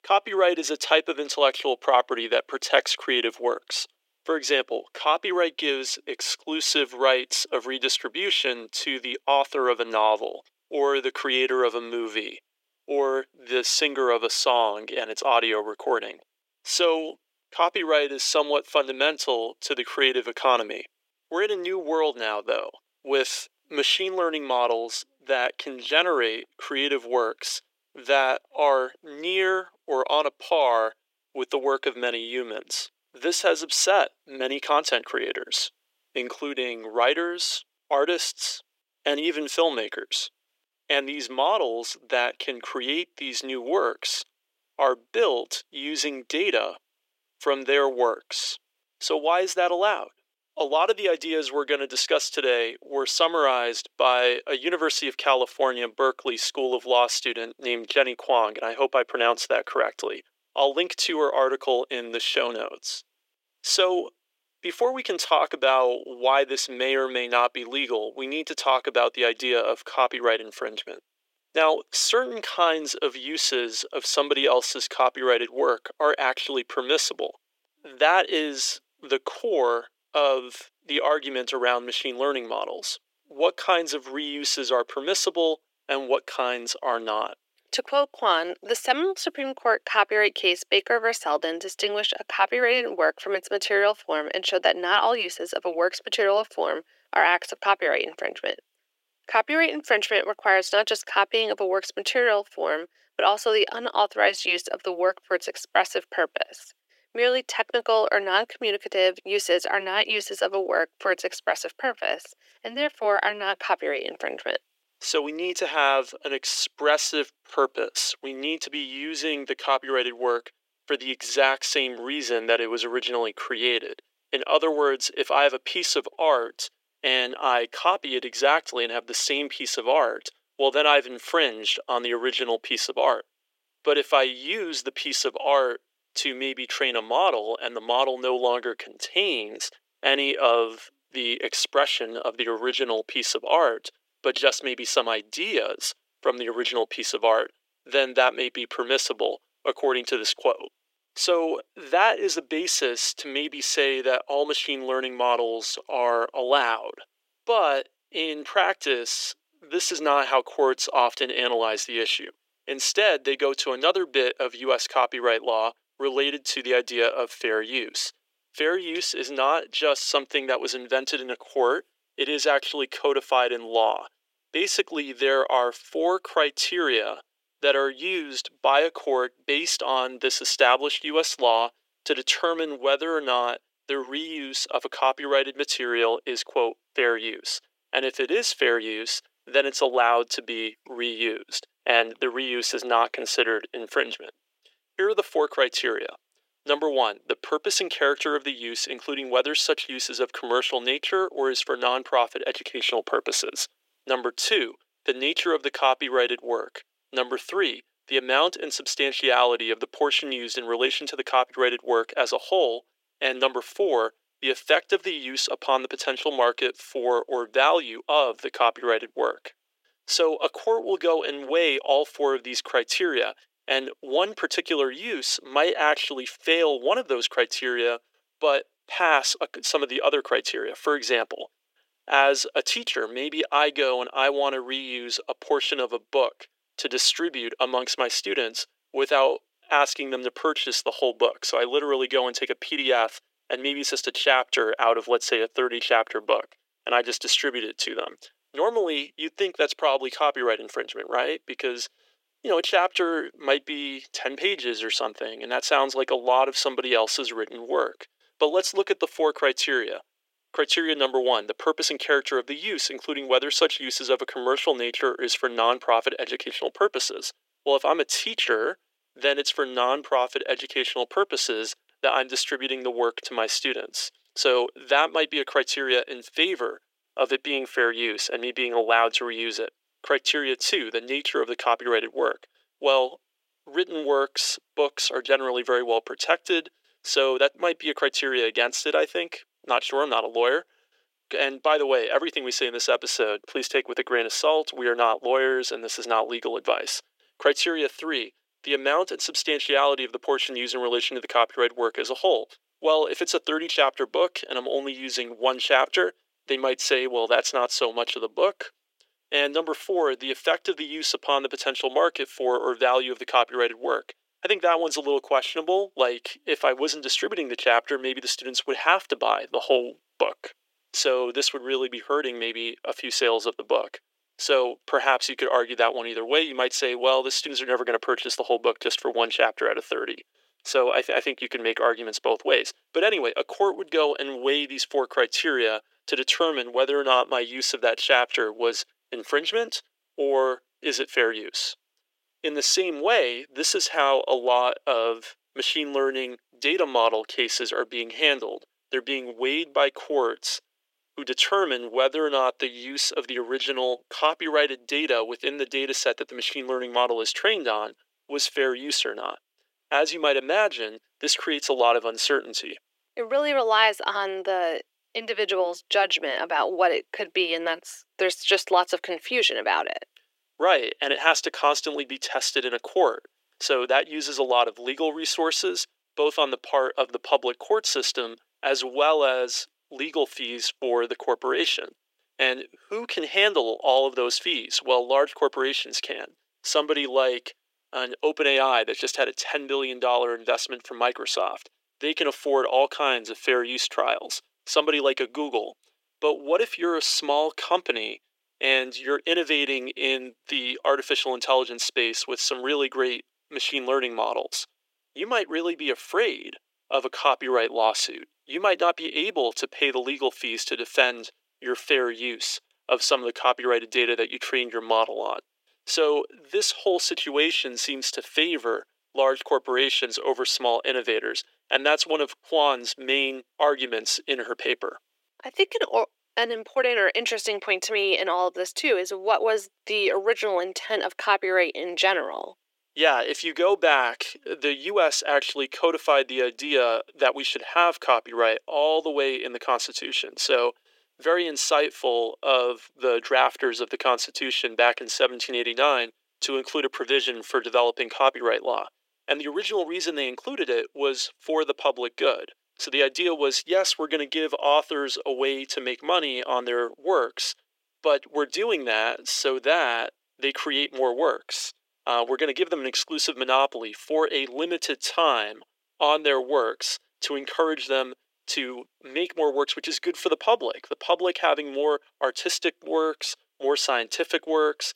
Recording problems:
thin; very; fading below 350 Hz

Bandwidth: 16 kHz